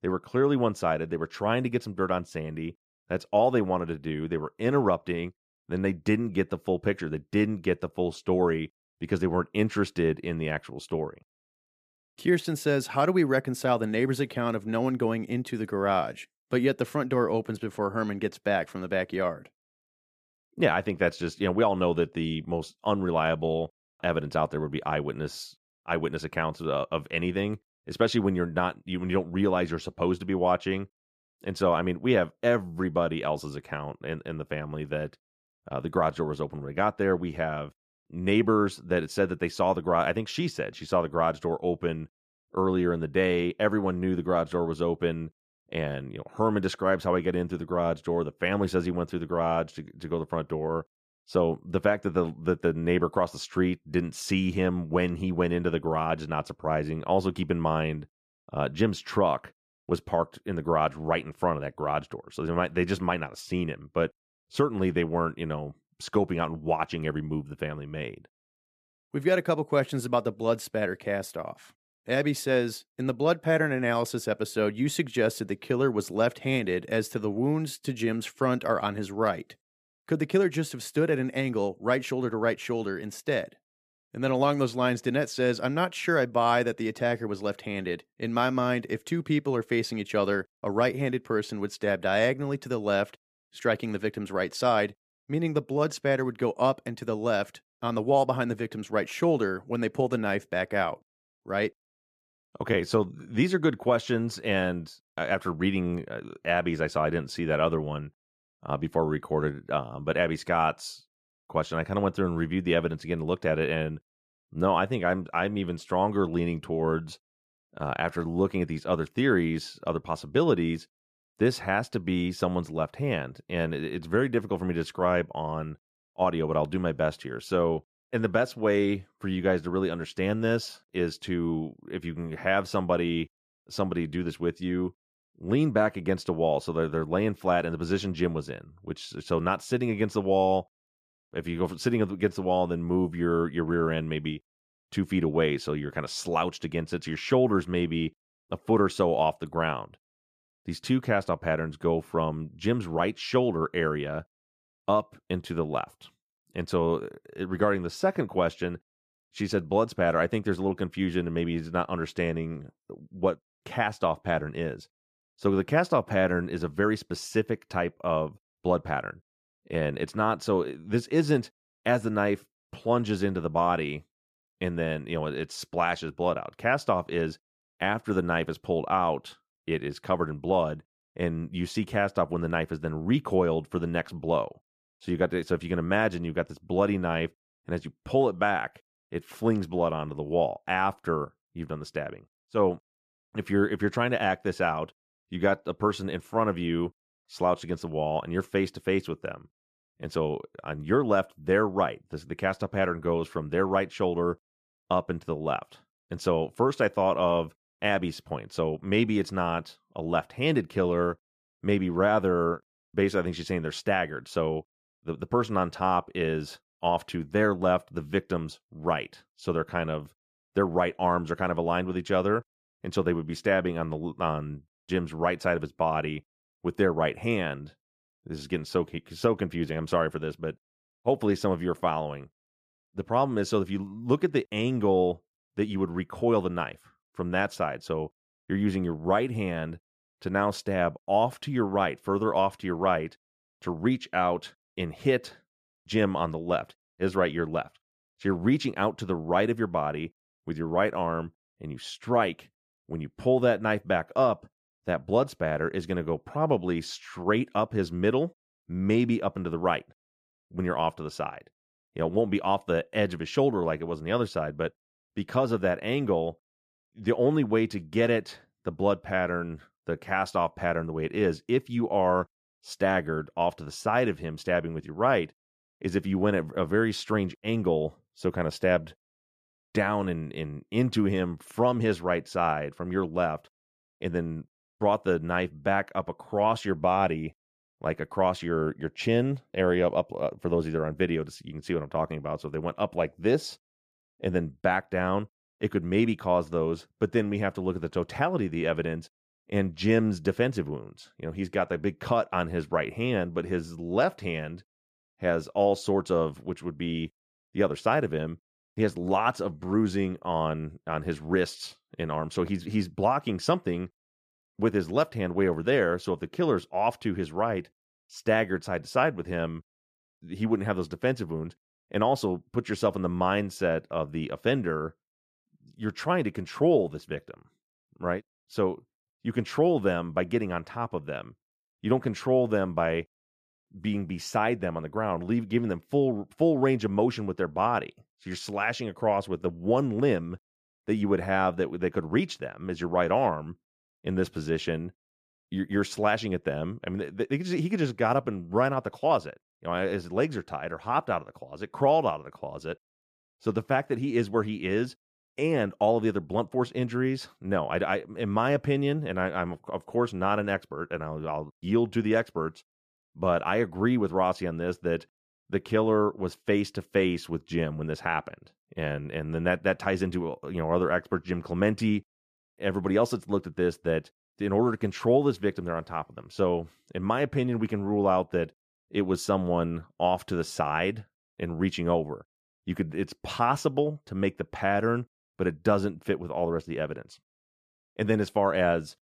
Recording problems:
none

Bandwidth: 14.5 kHz